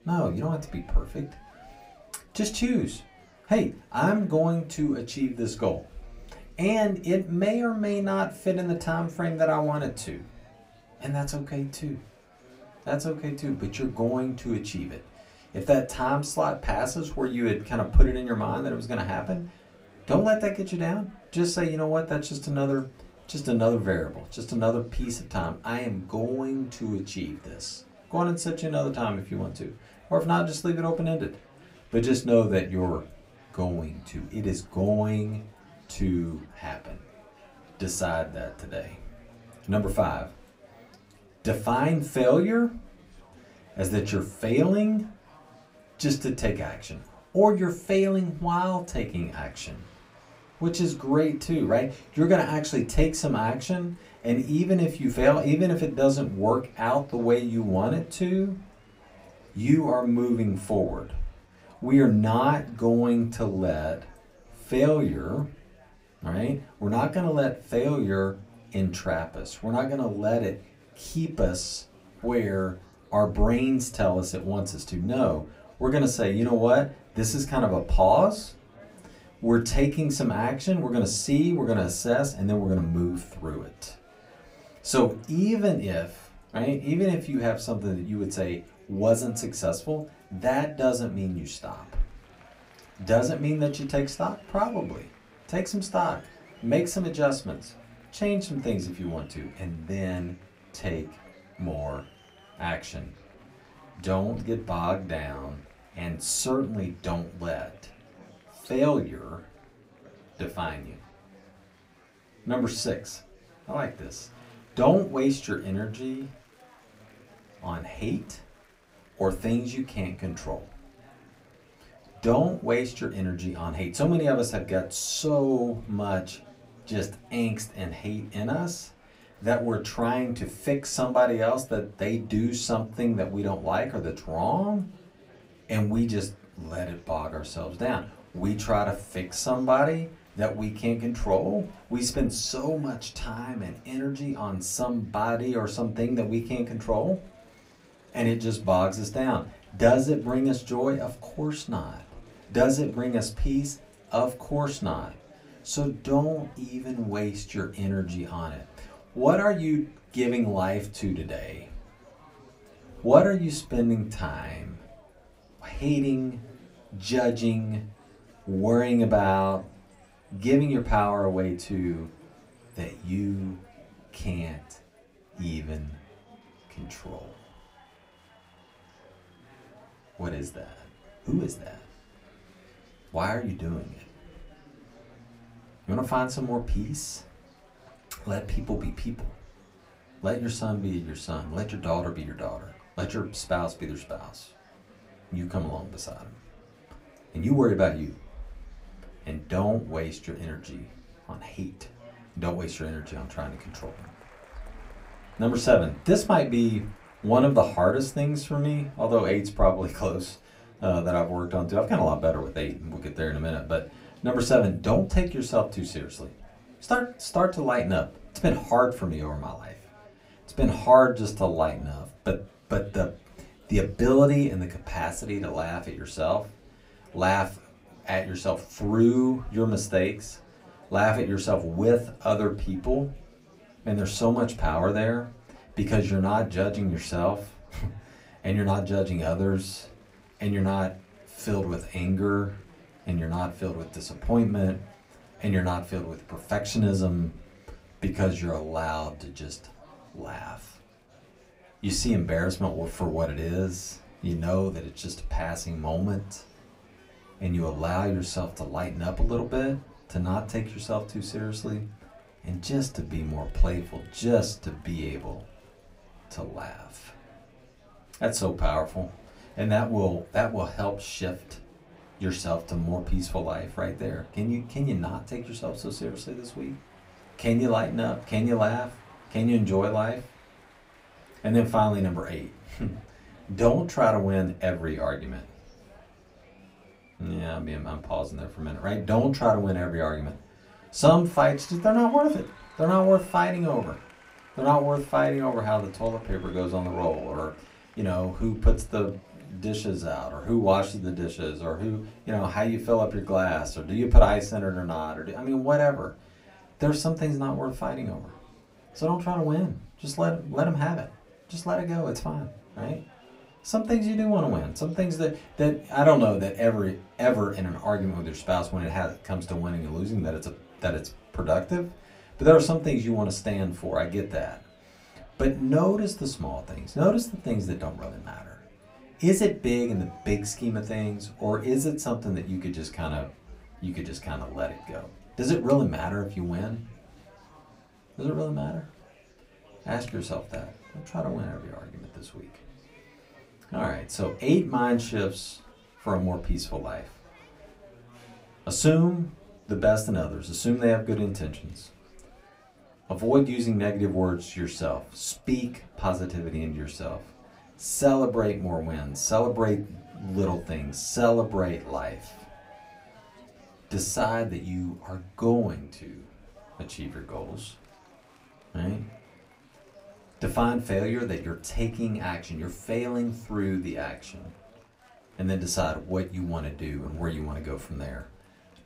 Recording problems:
off-mic speech; far
room echo; very slight; dies away in 0.2 s
murmuring crowd; faint; throughout; 25 dB below the speech

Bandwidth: 15.5 kHz